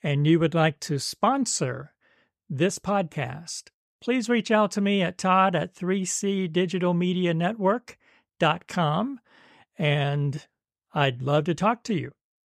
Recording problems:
none

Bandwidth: 14 kHz